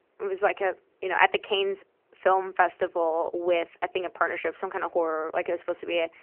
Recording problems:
phone-call audio; nothing above 3 kHz

